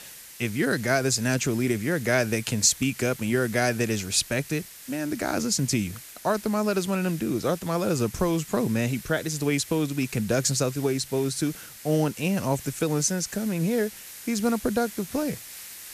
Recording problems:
hiss; noticeable; throughout; 15 dB below the speech

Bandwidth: 14.5 kHz